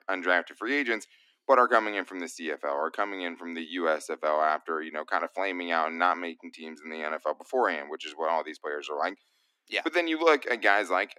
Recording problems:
thin; somewhat; fading below 250 Hz

